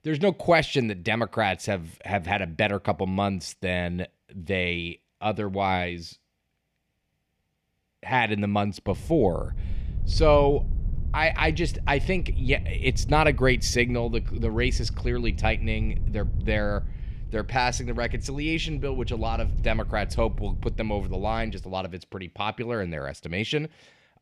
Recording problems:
wind noise on the microphone; occasional gusts; from 9 to 22 s; 20 dB below the speech

